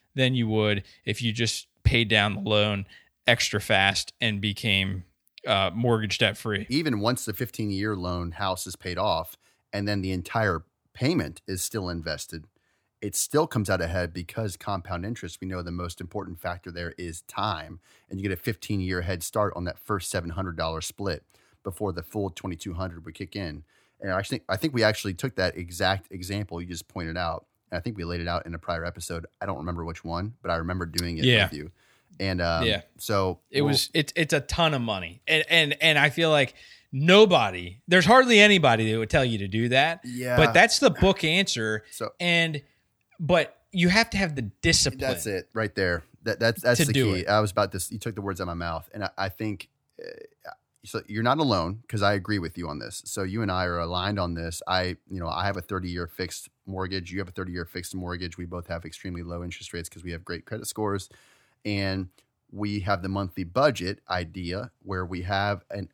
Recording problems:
none

